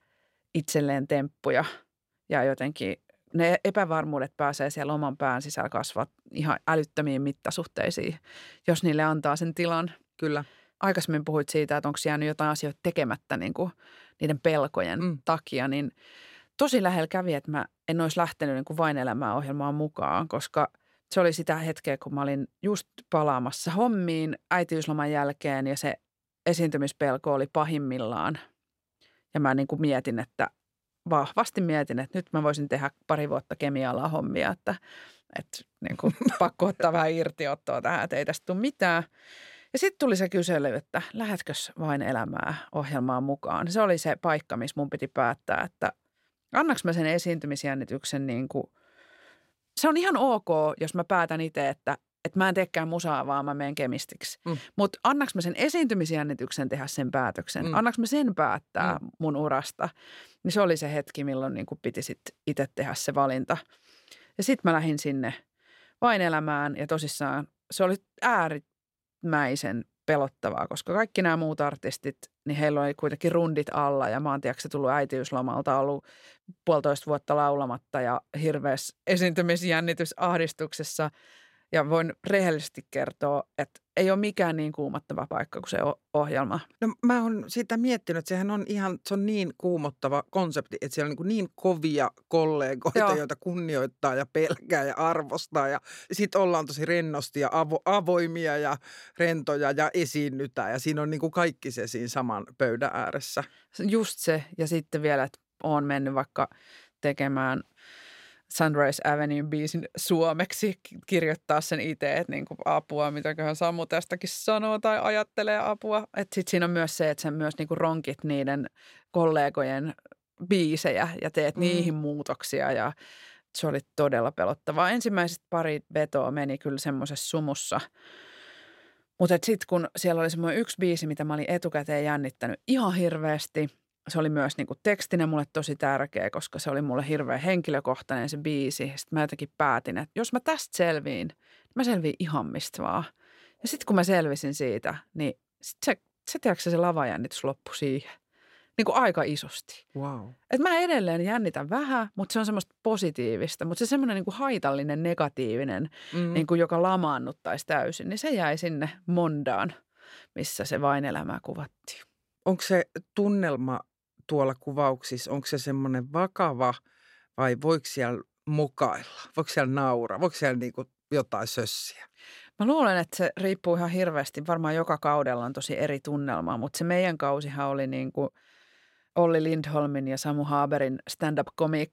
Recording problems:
none

